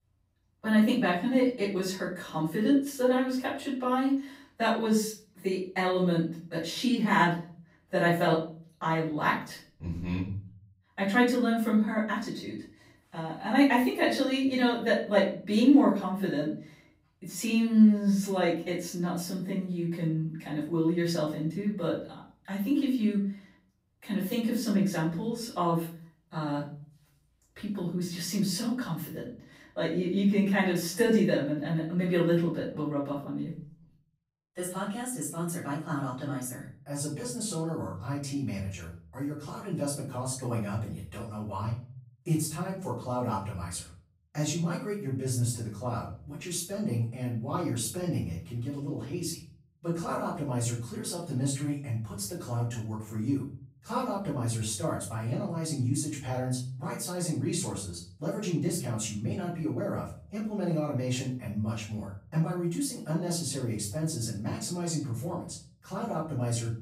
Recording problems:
off-mic speech; far
room echo; noticeable; dies away in 0.5 s

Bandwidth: 15.5 kHz